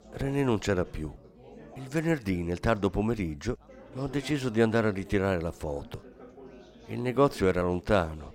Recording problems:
chatter from many people; faint; throughout; 20 dB below the speech

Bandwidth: 16 kHz